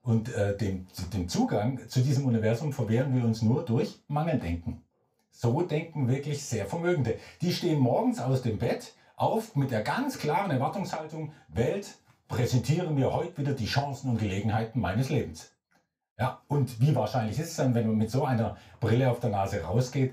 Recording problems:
off-mic speech; far
room echo; slight; dies away in 0.3 s

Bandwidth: 15.5 kHz